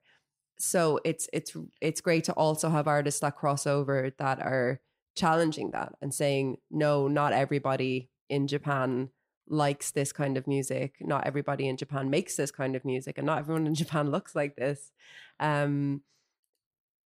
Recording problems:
none

